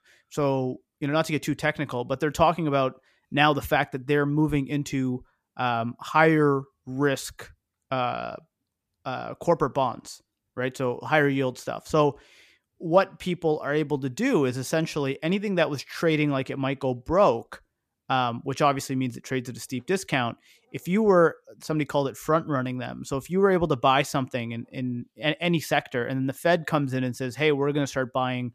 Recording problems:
none

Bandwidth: 14.5 kHz